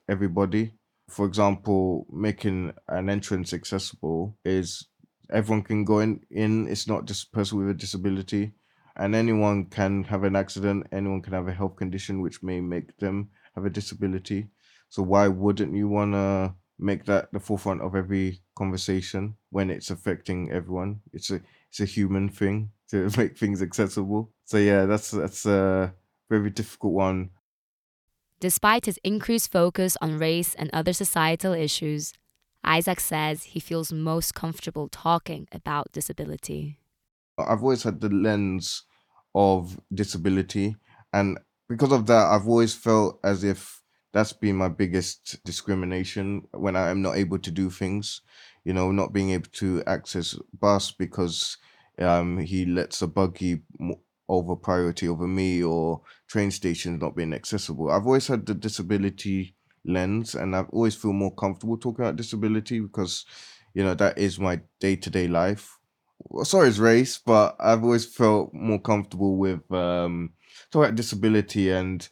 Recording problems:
none

